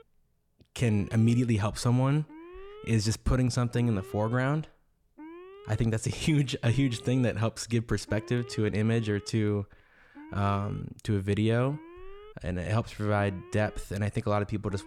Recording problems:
alarms or sirens; faint; throughout; 20 dB below the speech

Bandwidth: 18 kHz